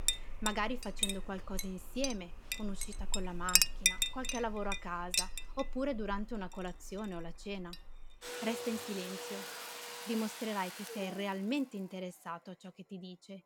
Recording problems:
household noises; very loud; throughout; 4 dB above the speech

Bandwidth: 17 kHz